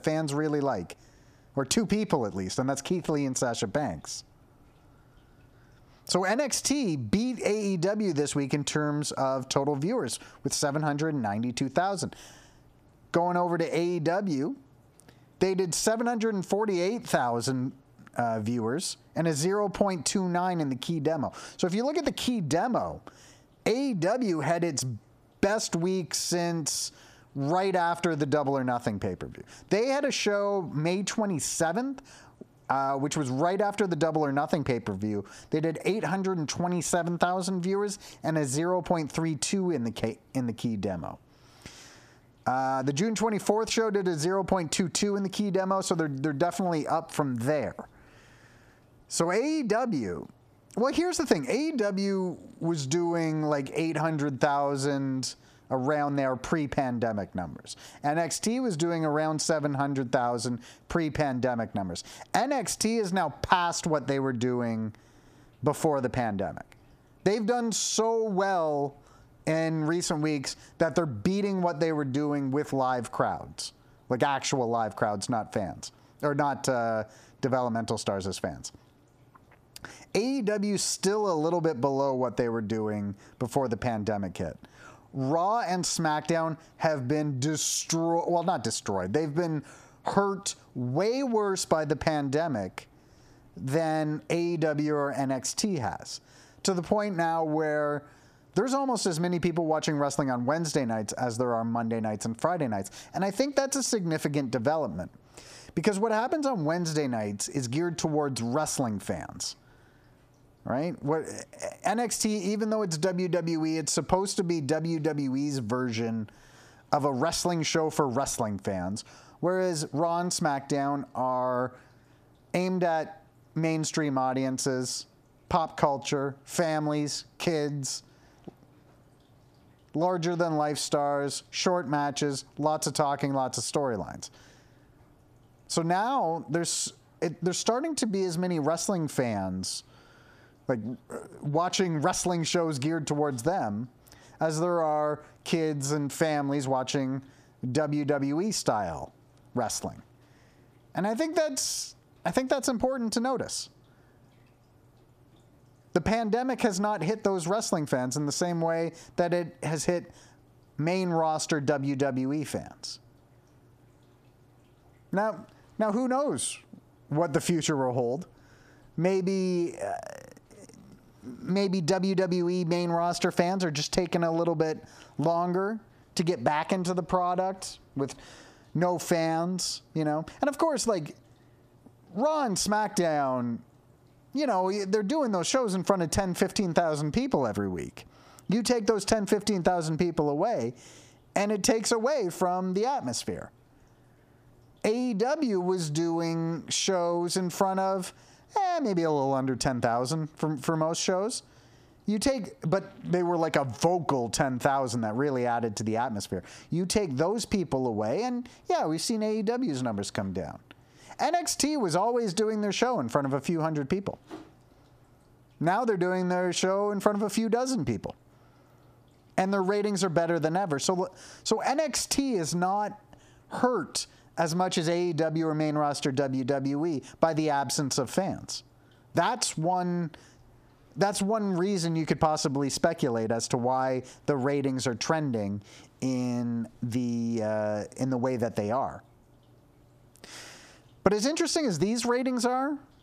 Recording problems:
squashed, flat; heavily

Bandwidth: 14.5 kHz